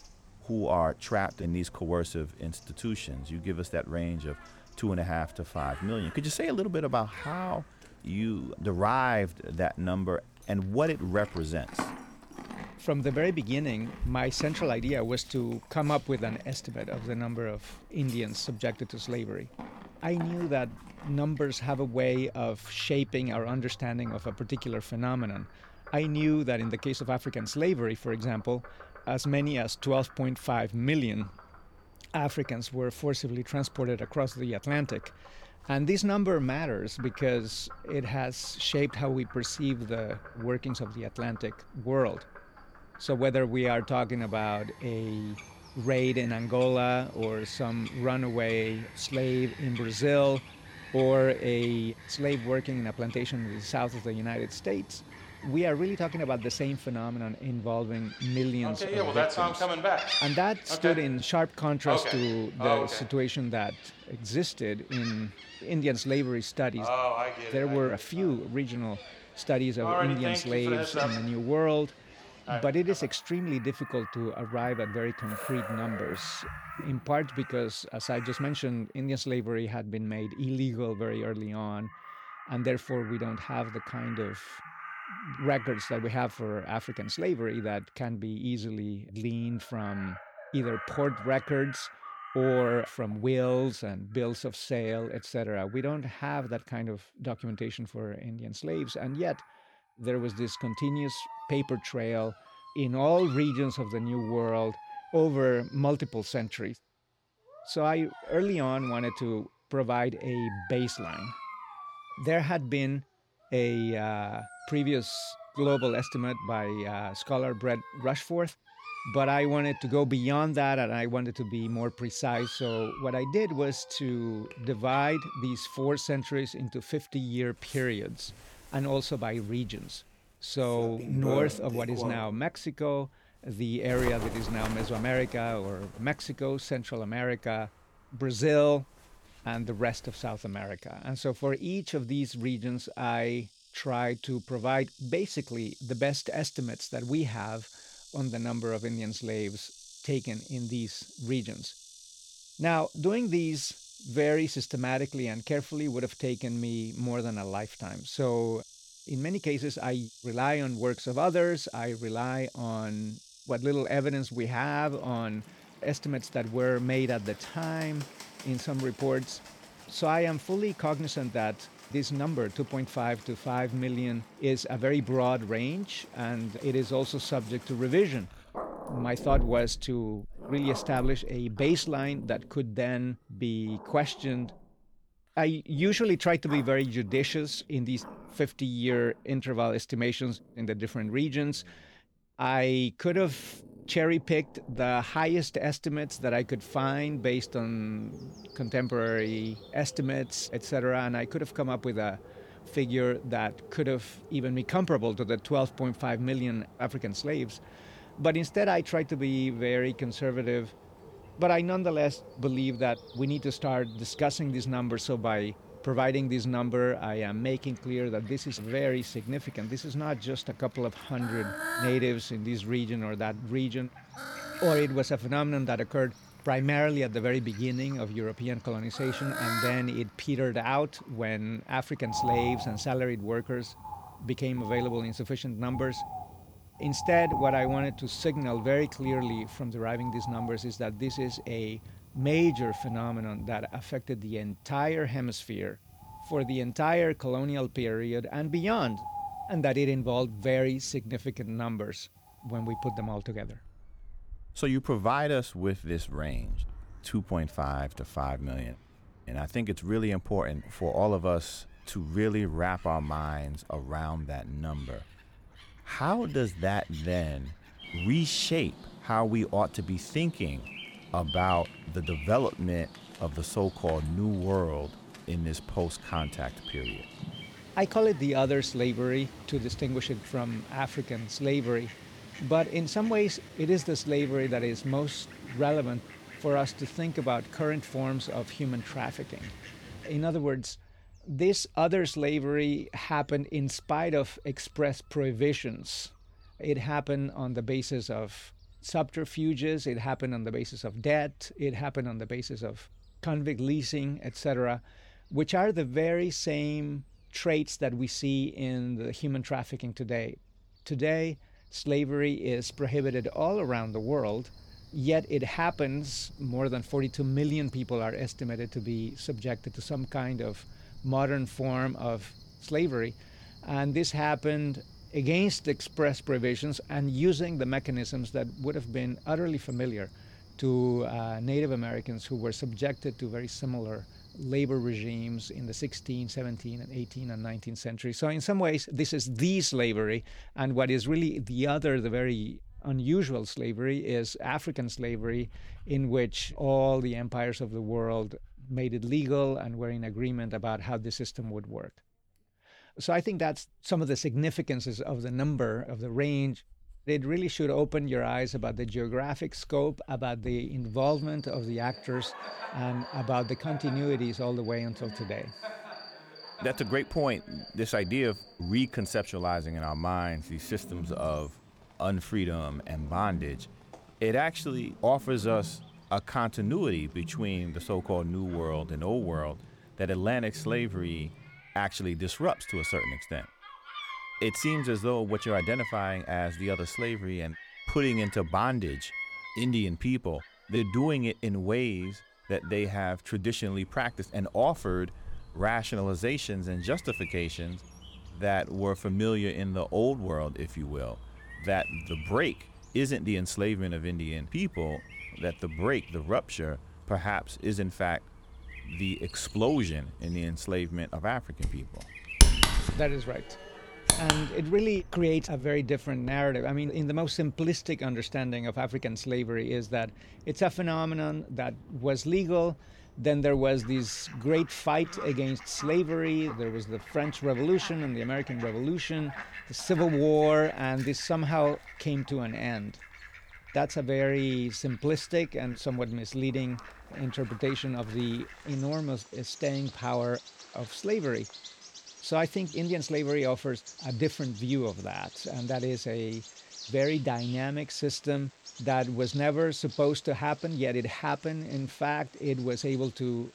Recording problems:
animal sounds; noticeable; throughout; 10 dB below the speech

